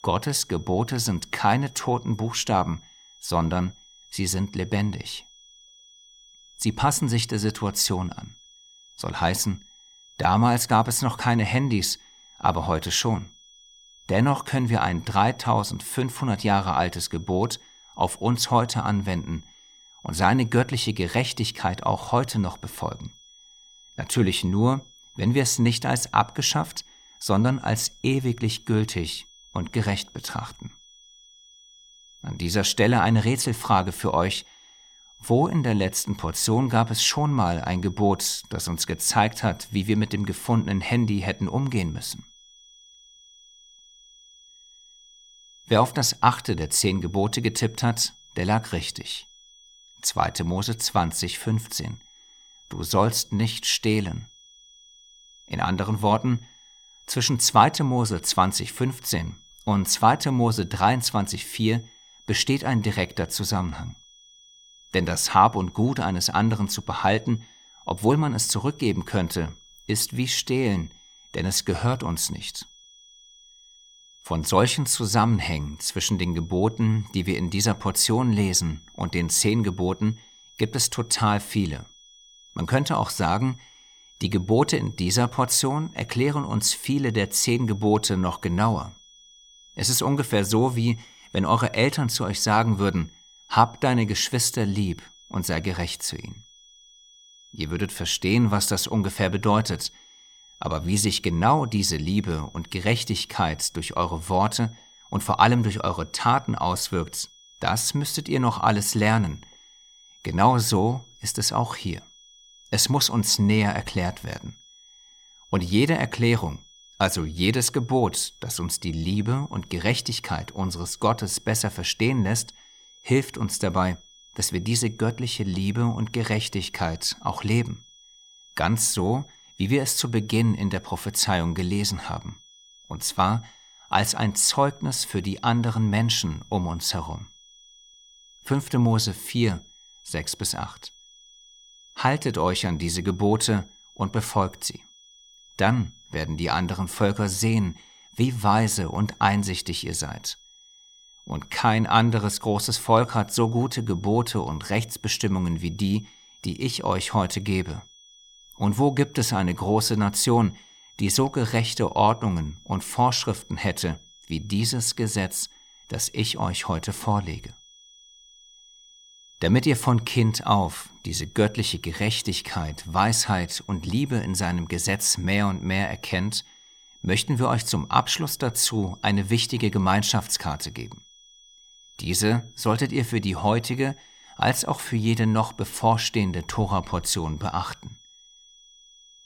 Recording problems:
high-pitched whine; faint; throughout; 3.5 kHz, 25 dB below the speech

